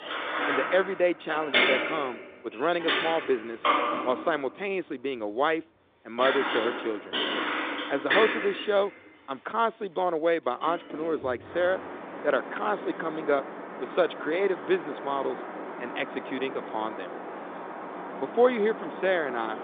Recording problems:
phone-call audio; nothing above 3.5 kHz
traffic noise; loud; throughout; 3 dB below the speech

